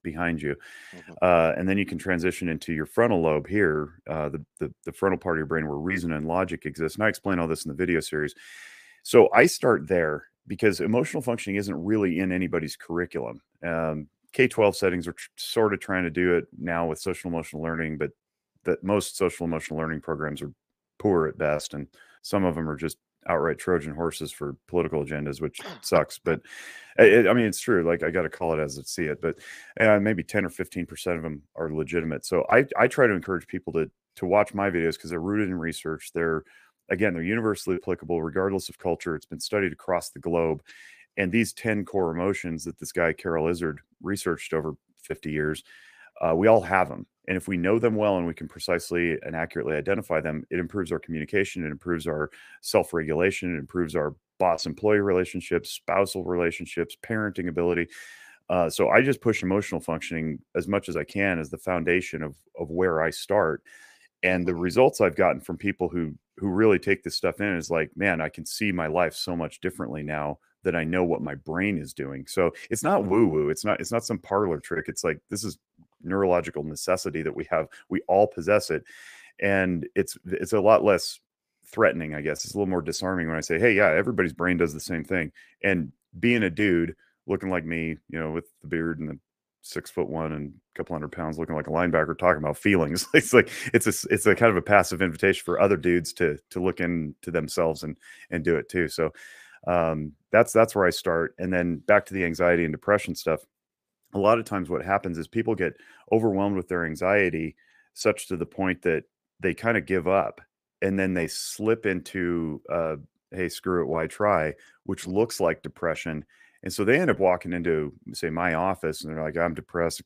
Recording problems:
none

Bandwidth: 15 kHz